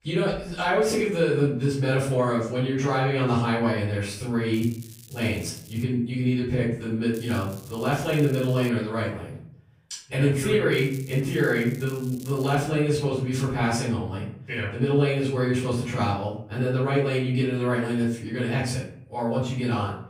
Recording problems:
off-mic speech; far
room echo; noticeable; dies away in 0.5 s
crackling; faint; from 4.5 to 6 s, from 7 to 8.5 s and from 11 to 13 s; 20 dB below the speech

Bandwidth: 15.5 kHz